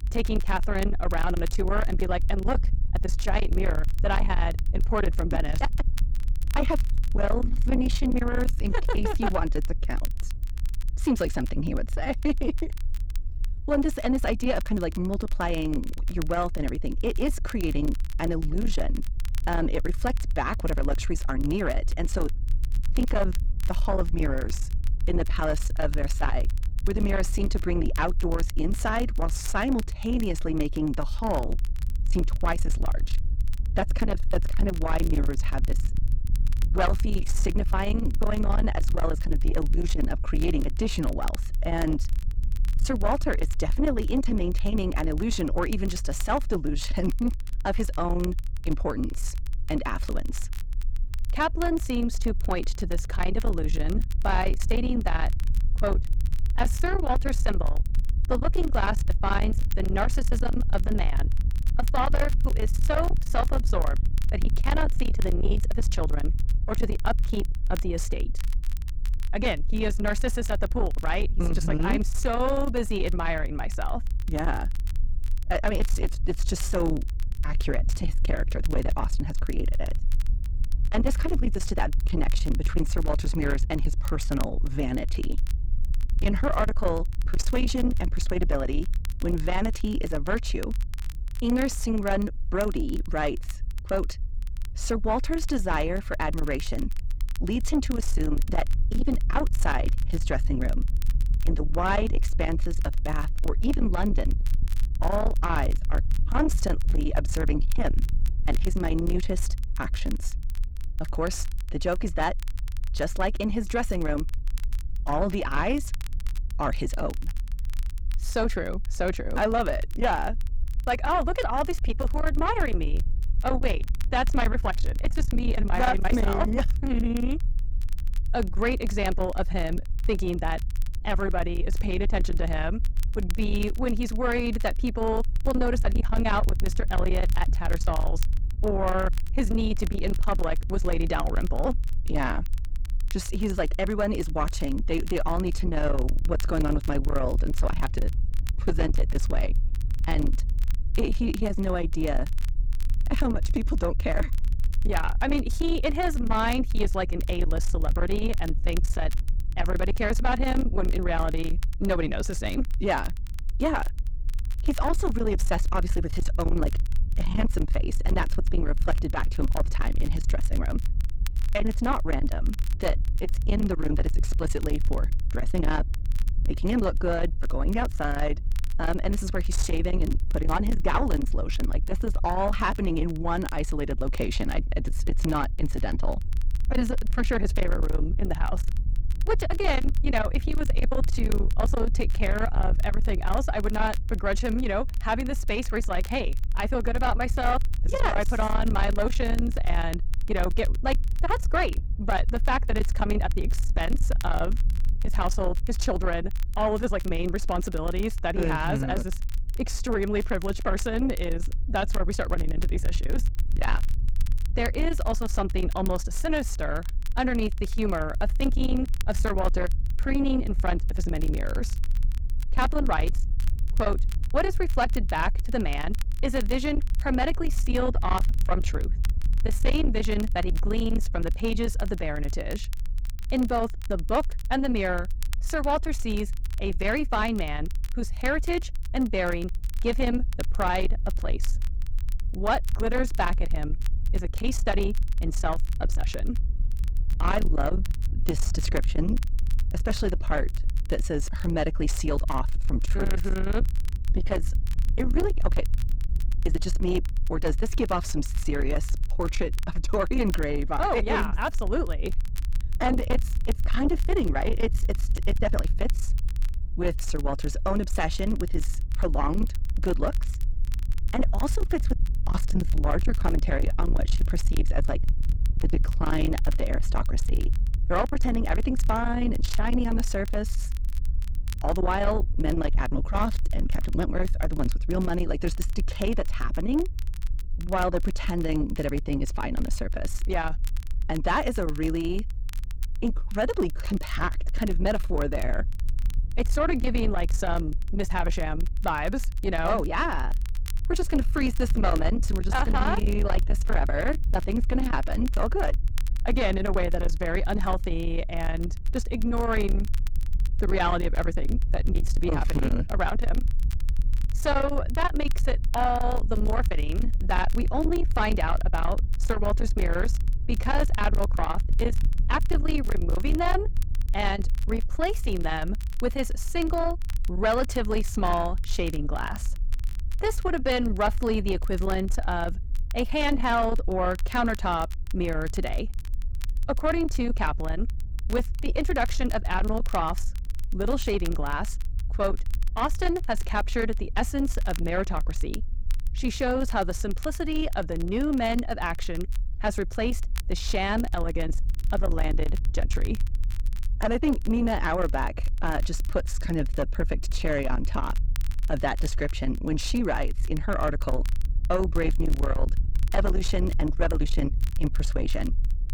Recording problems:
distortion; slight; 10 dB below the speech
low rumble; noticeable; throughout; 10 dB below the speech
crackle, like an old record; faint; 20 dB below the speech

